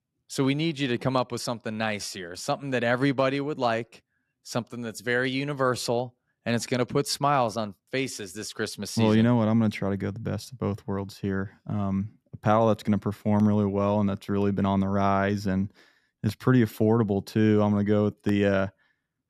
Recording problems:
none

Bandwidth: 14 kHz